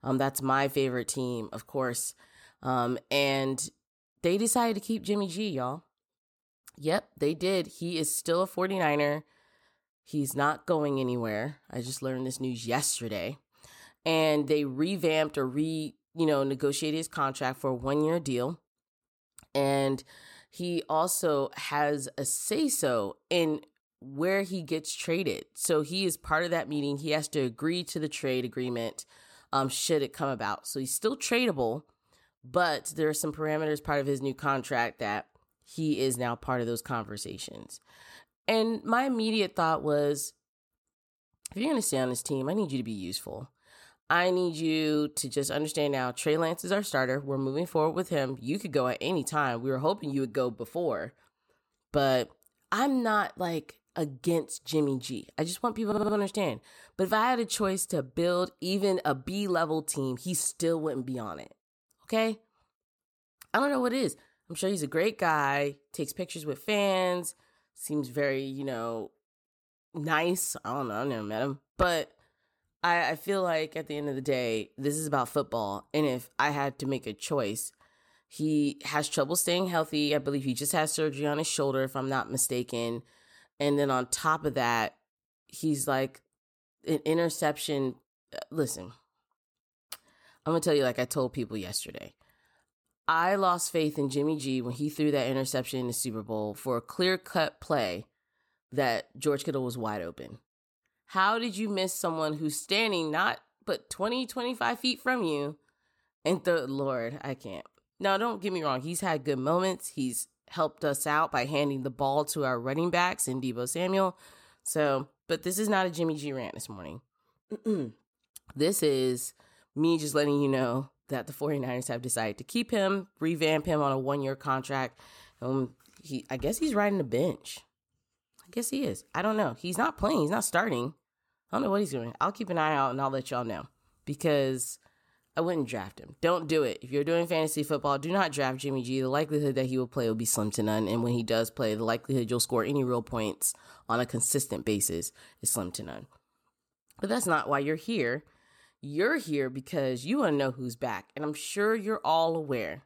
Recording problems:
audio stuttering; at 56 s

